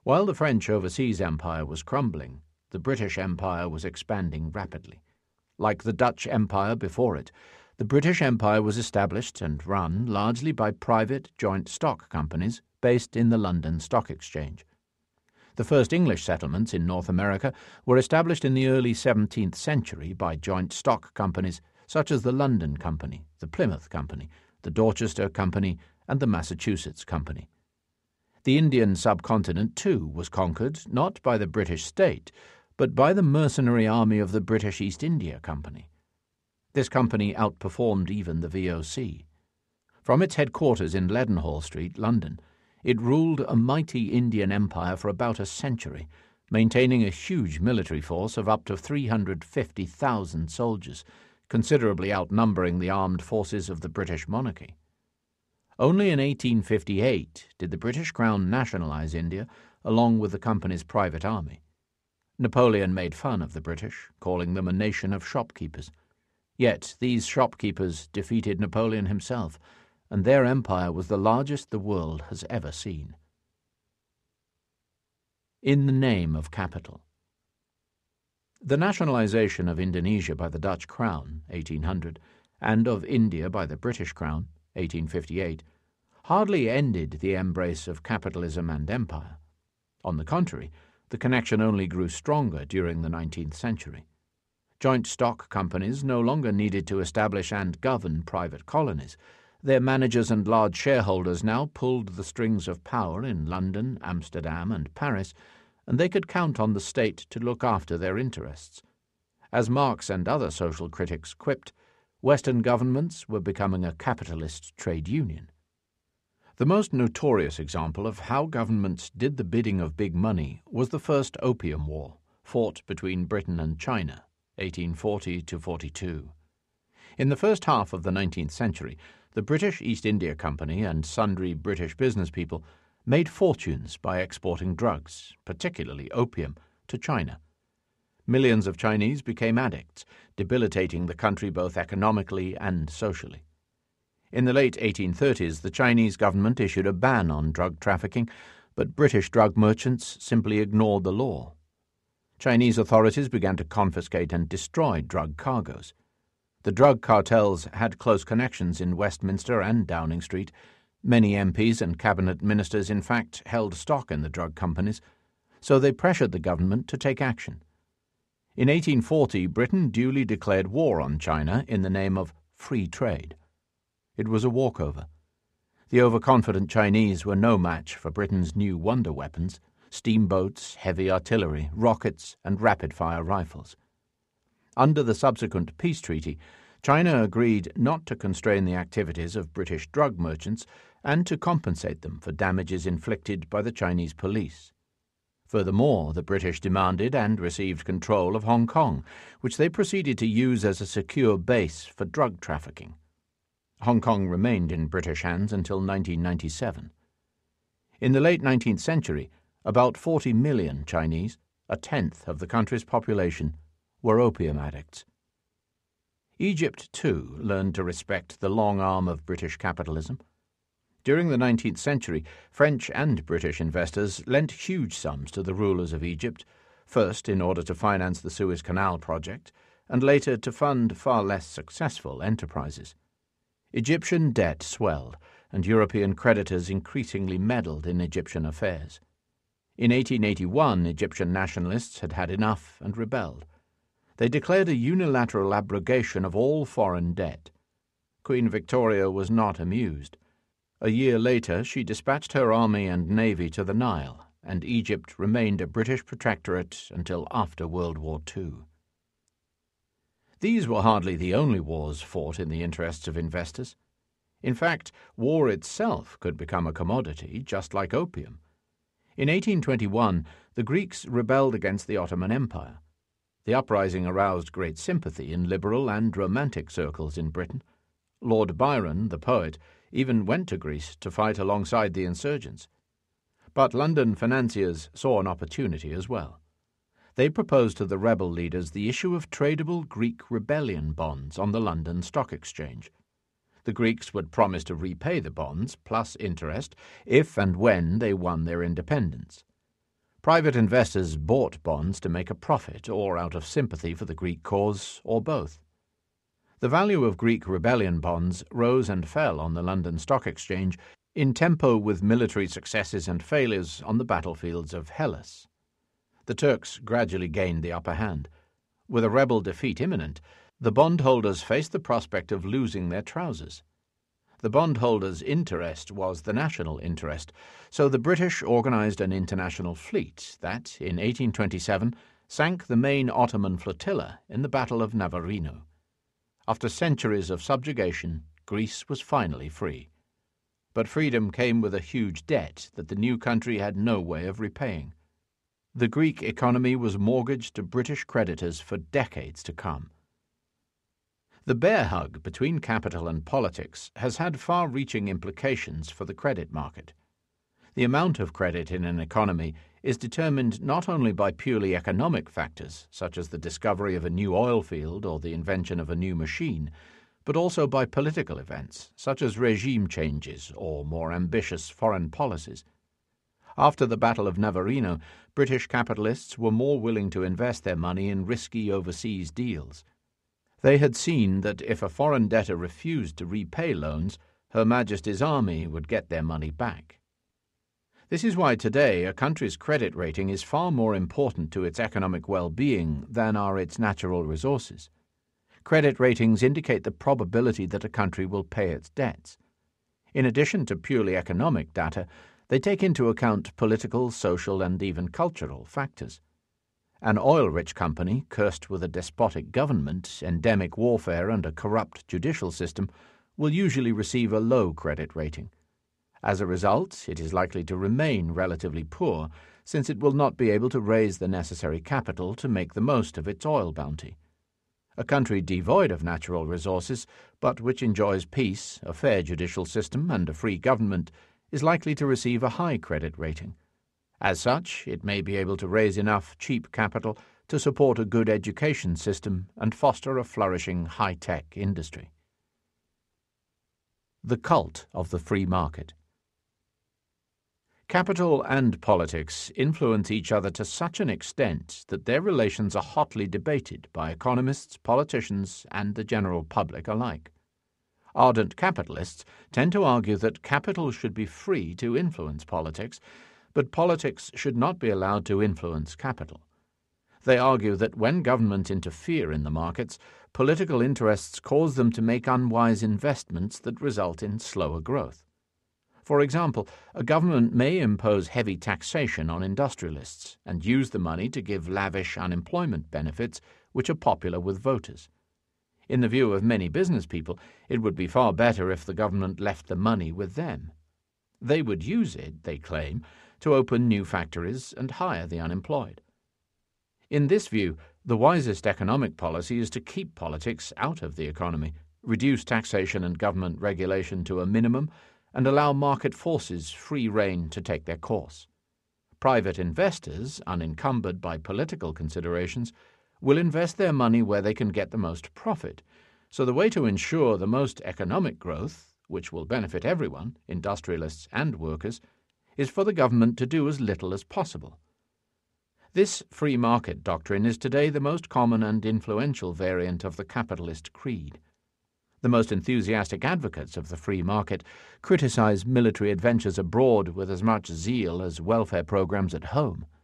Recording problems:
none

